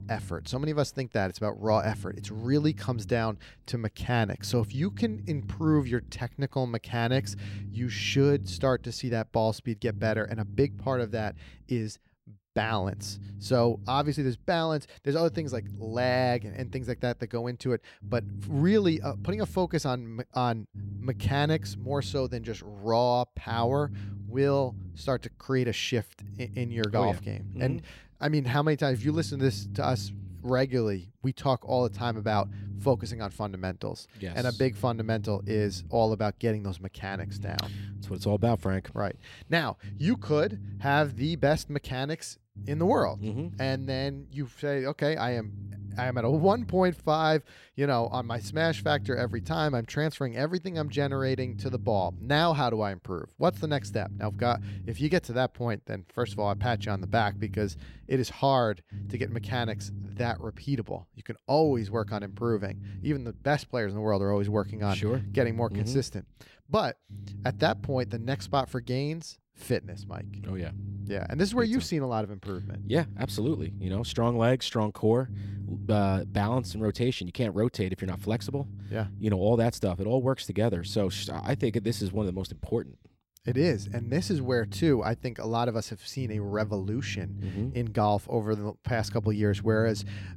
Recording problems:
low rumble; faint; throughout; 20 dB below the speech

